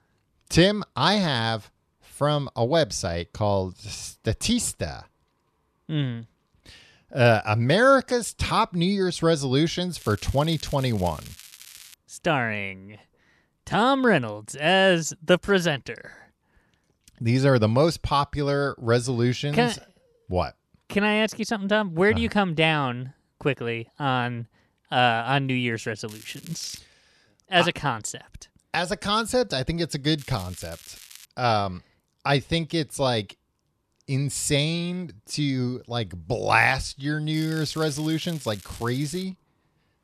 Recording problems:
crackling; faint; 4 times, first at 10 s; 20 dB below the speech

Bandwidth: 13.5 kHz